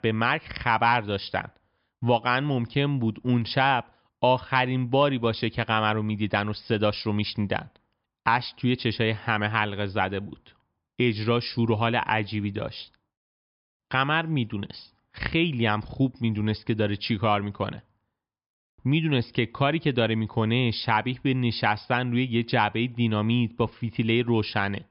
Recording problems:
high frequencies cut off; noticeable; nothing above 5.5 kHz

